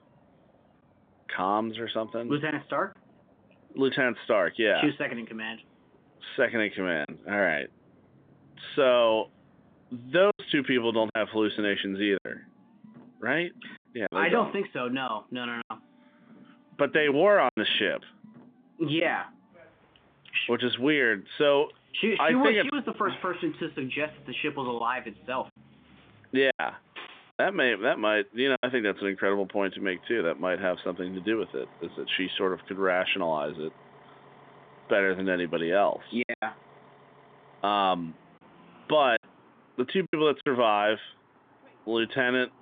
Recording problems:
phone-call audio; nothing above 3.5 kHz
traffic noise; faint; throughout; 30 dB below the speech
choppy; occasionally; 4% of the speech affected

